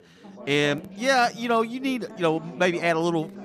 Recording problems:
background chatter; noticeable; throughout; 4 voices, 20 dB below the speech

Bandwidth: 14.5 kHz